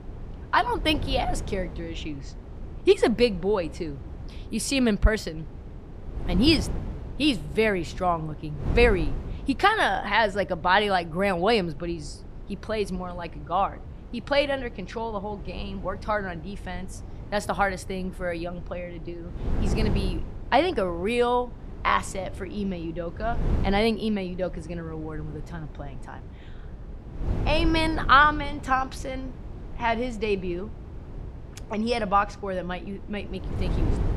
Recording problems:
wind noise on the microphone; occasional gusts; 20 dB below the speech

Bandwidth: 15 kHz